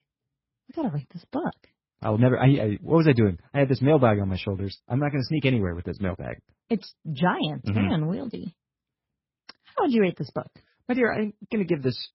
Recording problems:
garbled, watery; badly; nothing above 5.5 kHz

